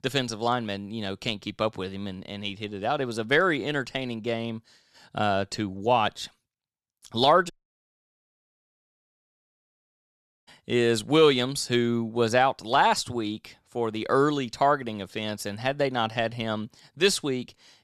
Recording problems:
audio cutting out; at 7.5 s for 3 s

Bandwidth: 13.5 kHz